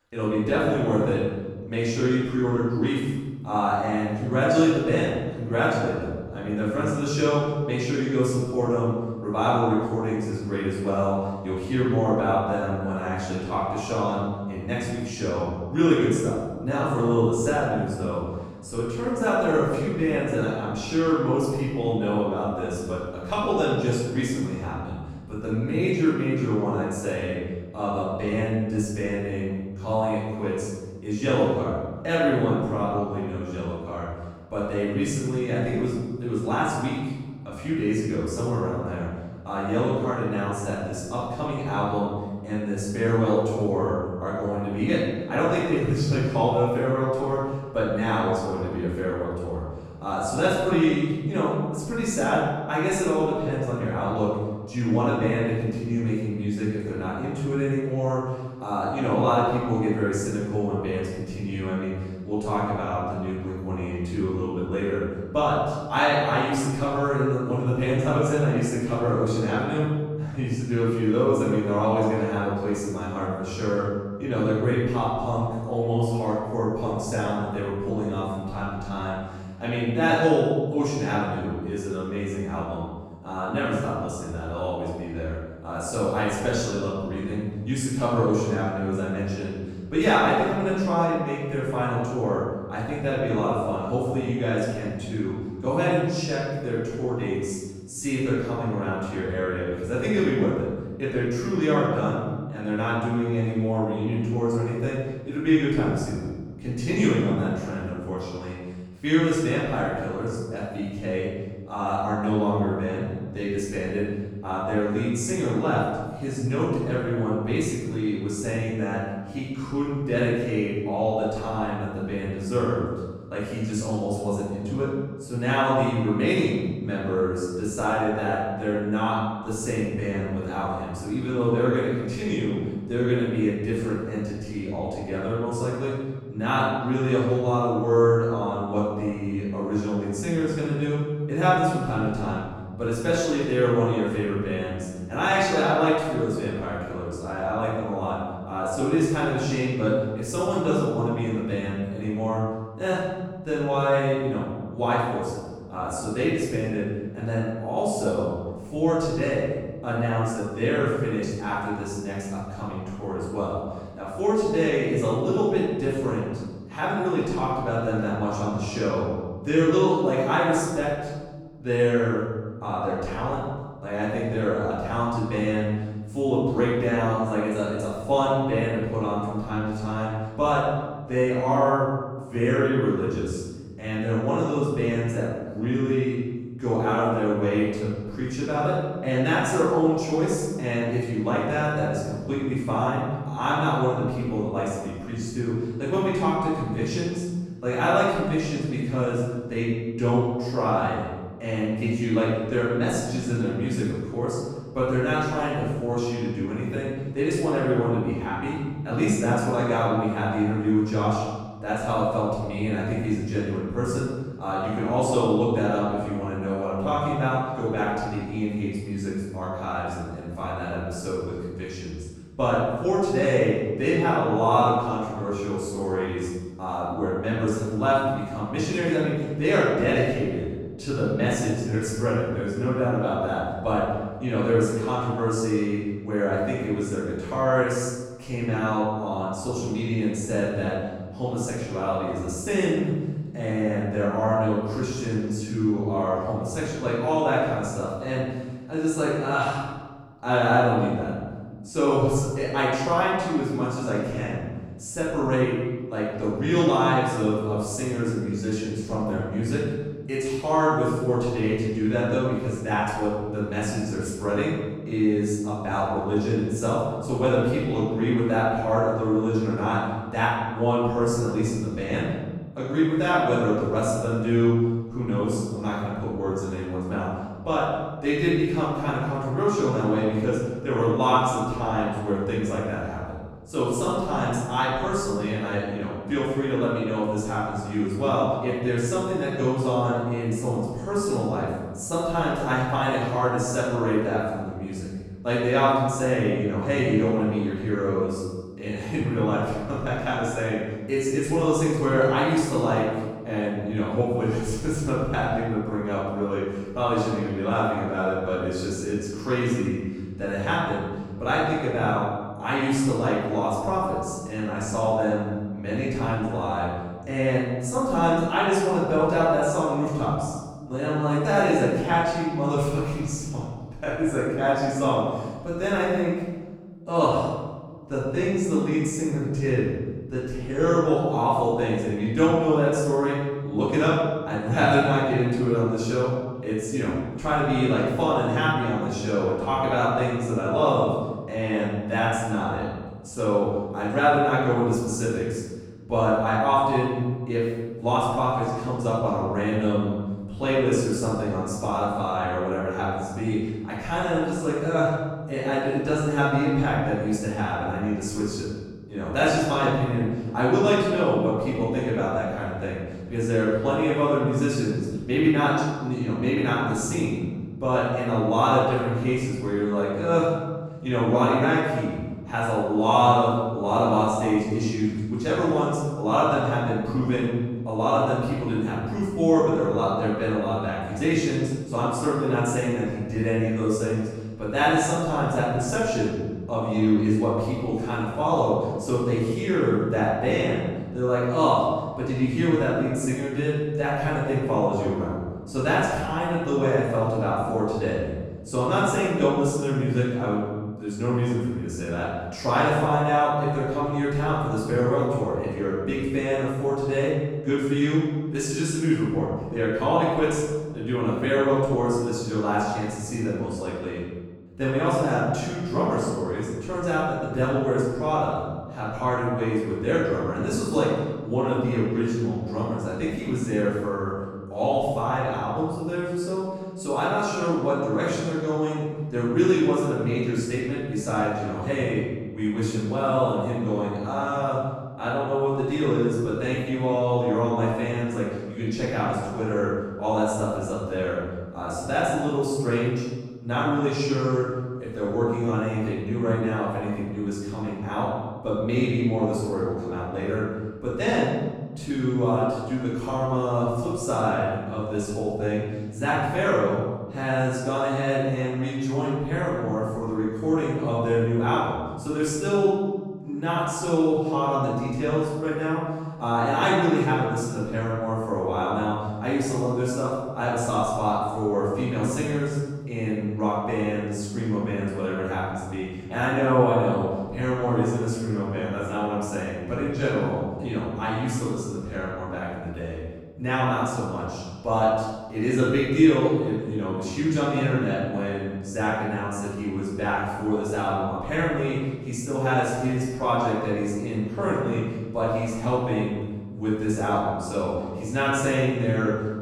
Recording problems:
room echo; strong; dies away in 1.2 s
off-mic speech; far

